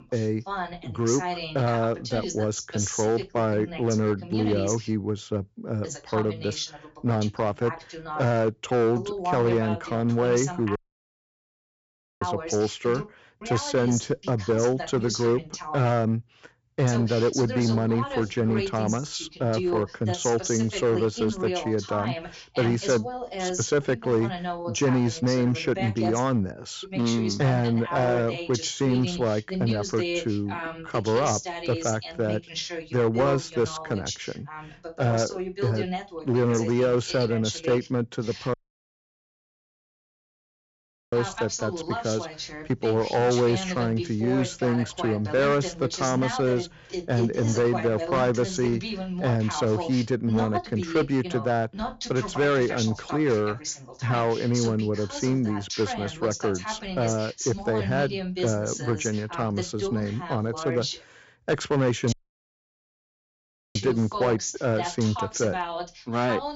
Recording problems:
high frequencies cut off; noticeable; nothing above 8 kHz
distortion; slight; 5% of the sound clipped
voice in the background; loud; throughout; 7 dB below the speech
audio cutting out; at 11 s for 1.5 s, at 39 s for 2.5 s and at 1:02 for 1.5 s

